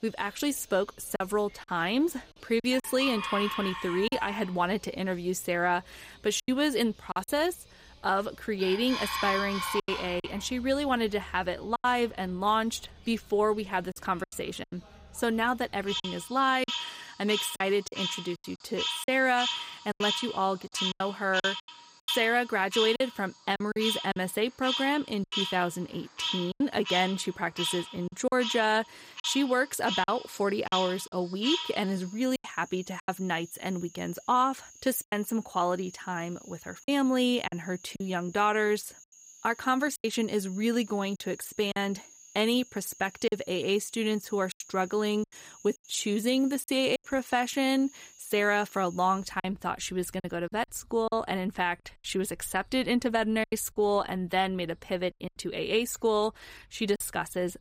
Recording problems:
animal sounds; loud; throughout; 5 dB below the speech
choppy; very; 6% of the speech affected

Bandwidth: 15.5 kHz